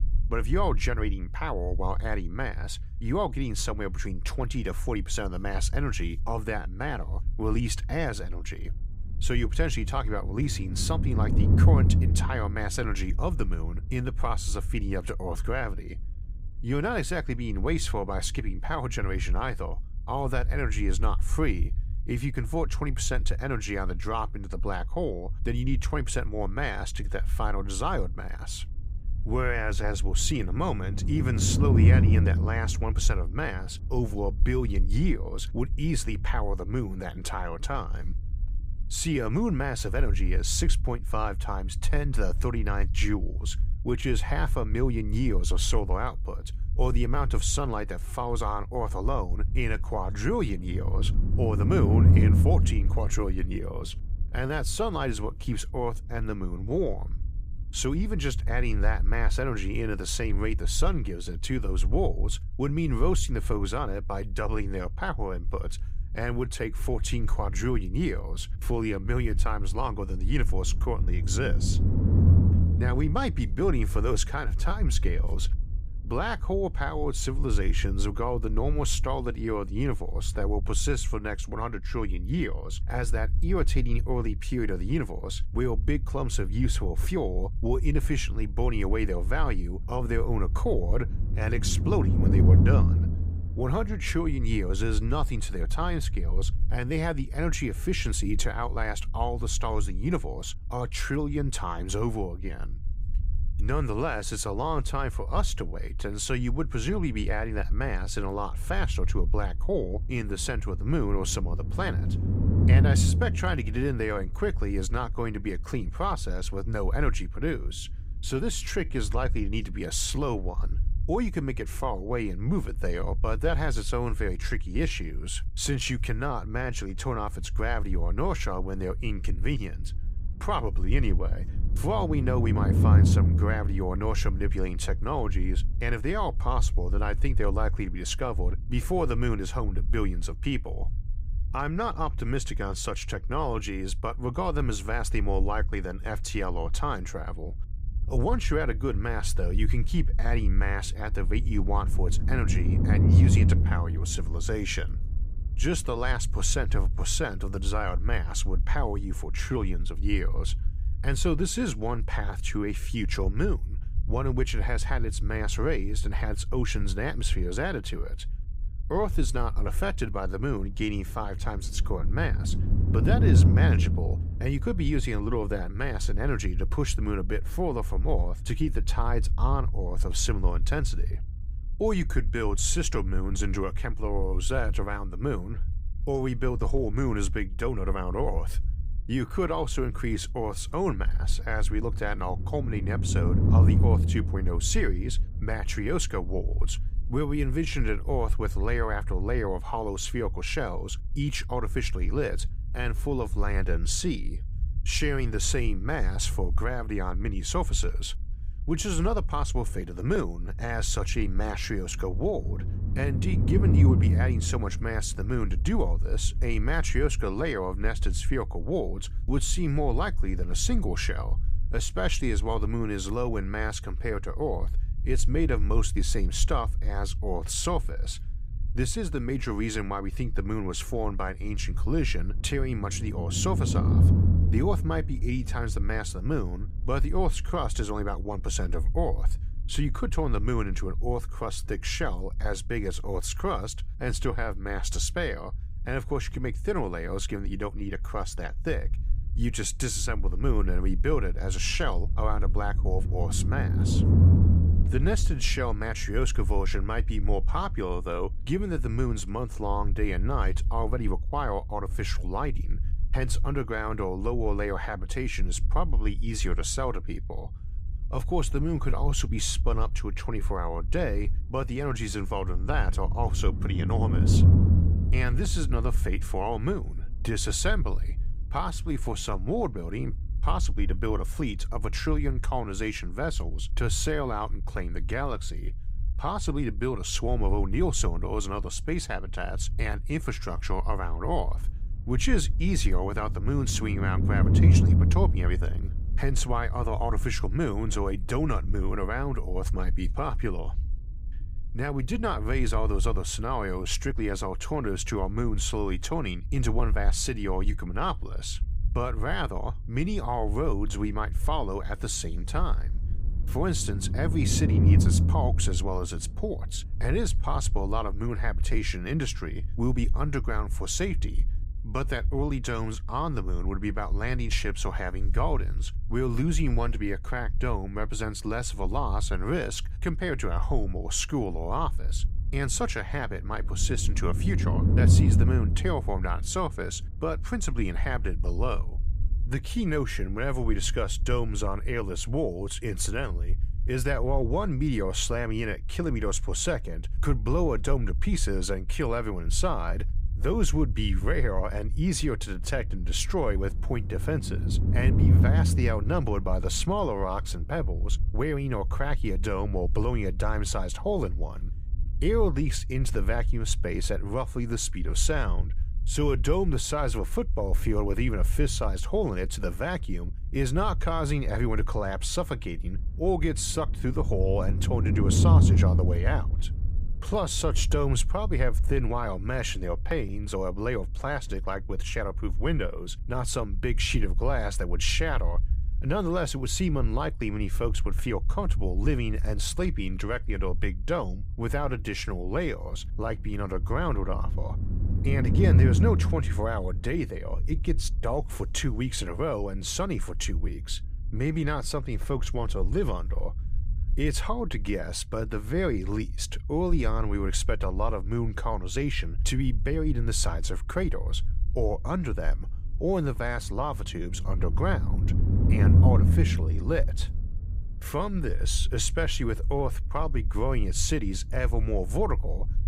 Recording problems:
low rumble; noticeable; throughout; 10 dB below the speech

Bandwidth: 15.5 kHz